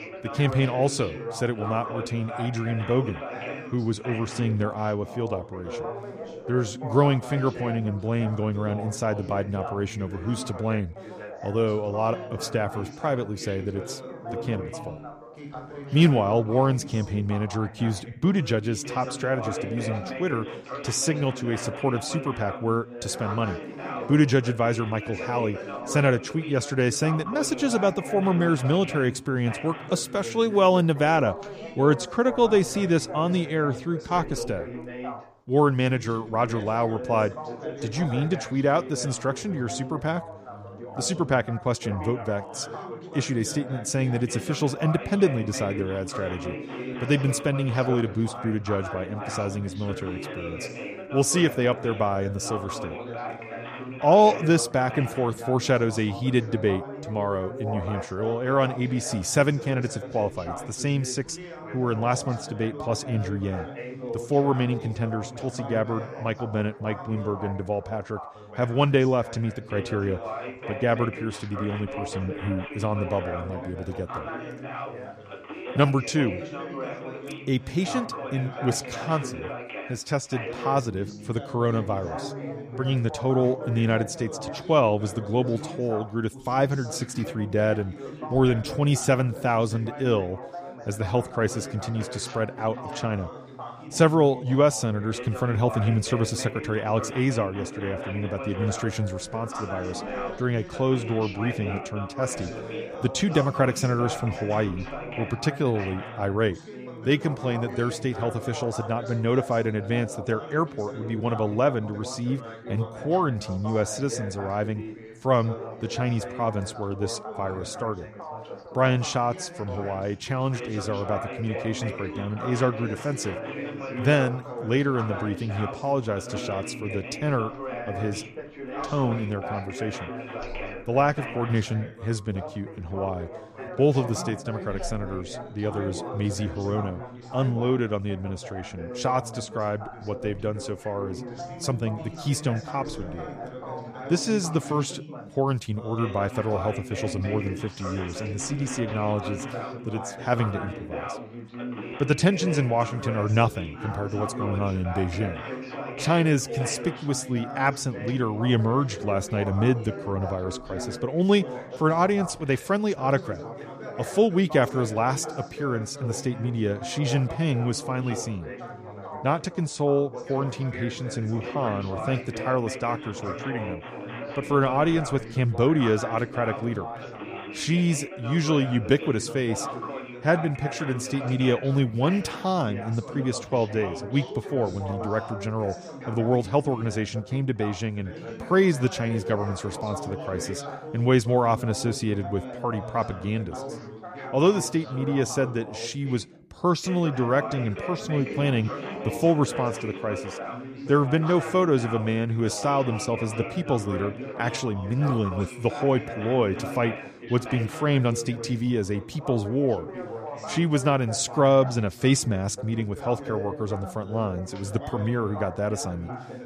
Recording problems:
background chatter; loud; throughout; 3 voices, 10 dB below the speech

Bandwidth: 15 kHz